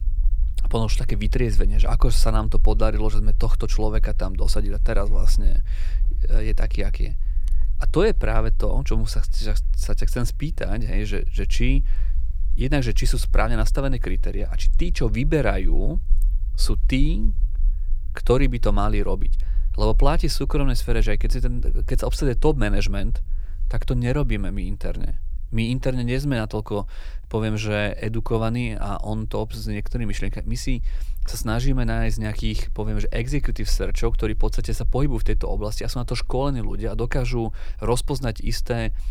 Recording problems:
low rumble; faint; throughout; 25 dB below the speech

